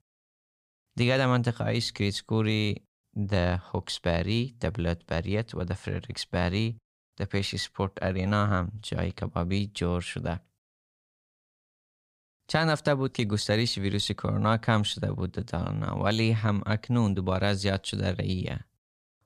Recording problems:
none

